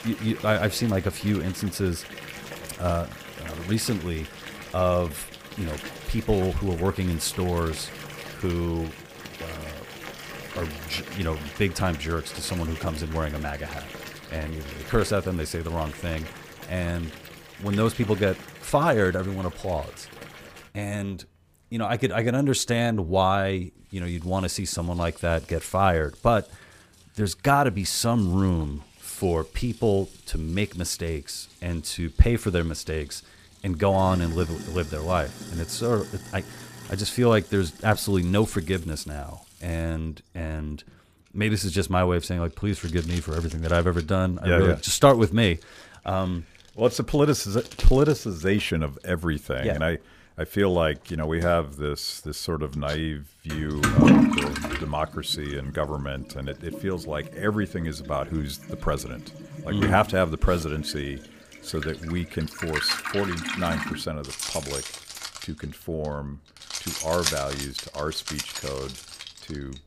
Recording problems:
household noises; loud; throughout; 7 dB below the speech

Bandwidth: 15 kHz